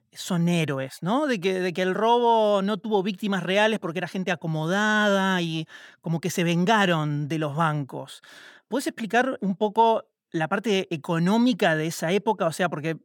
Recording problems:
none

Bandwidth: 18 kHz